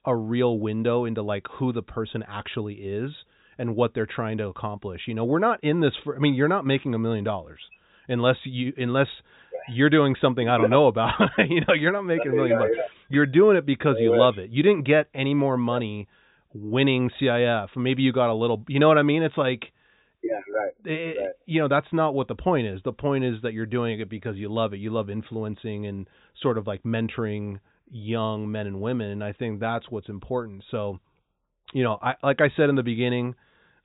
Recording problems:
high frequencies cut off; severe; nothing above 4 kHz

